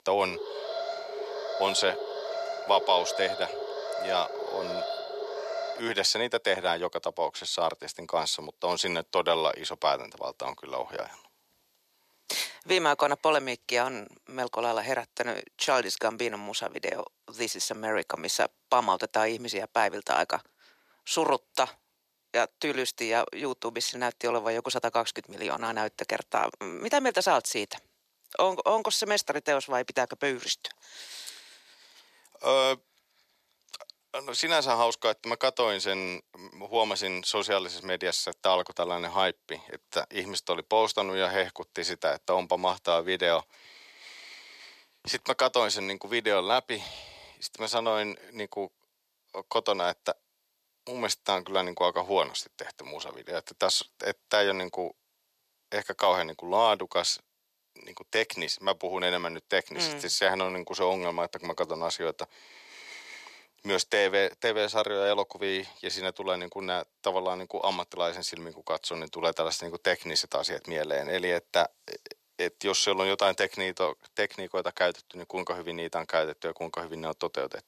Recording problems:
thin; very; fading below 500 Hz
alarm; noticeable; until 6 s; peak 4 dB below the speech

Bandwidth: 14 kHz